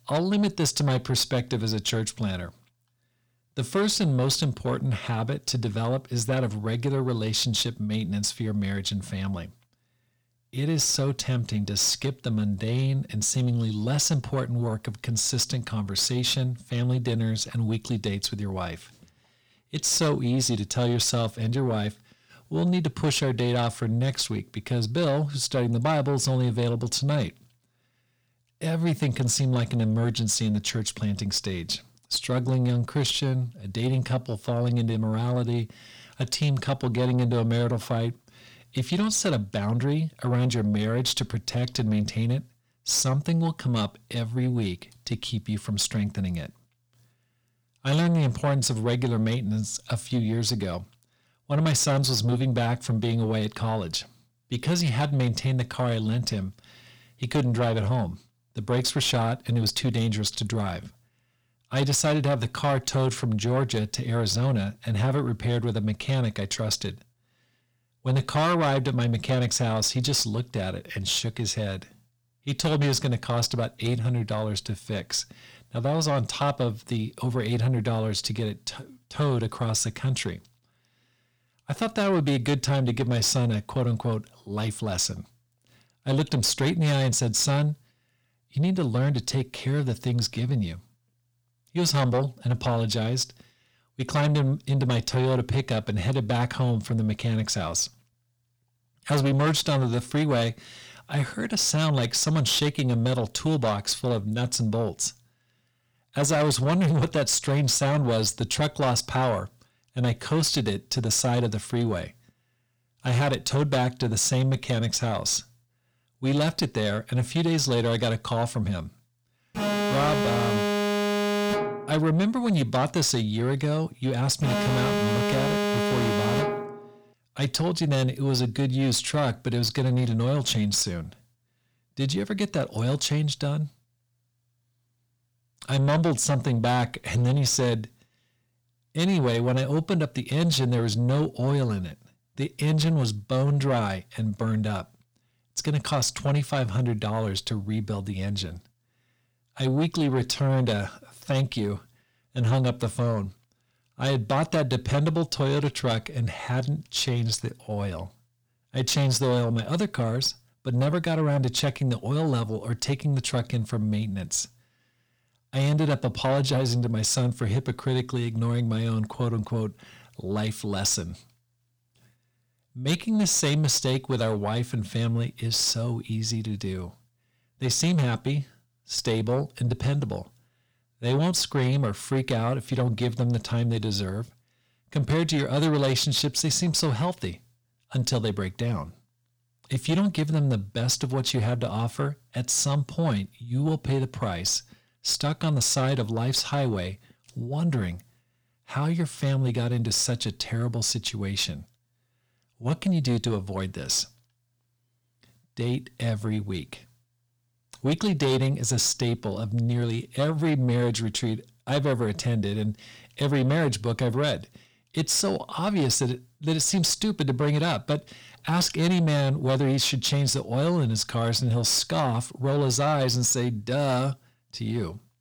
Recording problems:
distortion; slight; 10 dB below the speech
alarm; loud; from 2:00 to 2:07; peak 1 dB above the speech

